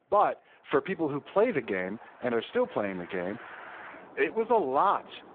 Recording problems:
phone-call audio; poor line
traffic noise; noticeable; throughout; 20 dB below the speech

